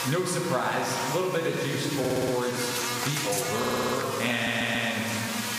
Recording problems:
room echo; noticeable; dies away in 1.5 s
off-mic speech; somewhat distant
squashed, flat; somewhat
electrical hum; loud; throughout; 60 Hz, 4 dB below the speech
audio stuttering; at 2 s, at 3.5 s and at 4.5 s

